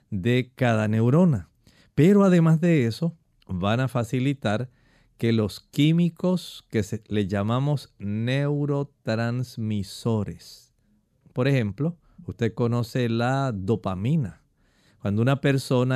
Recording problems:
abrupt cut into speech; at the end

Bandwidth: 14.5 kHz